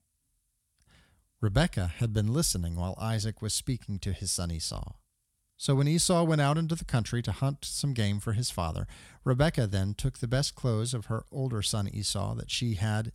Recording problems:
none

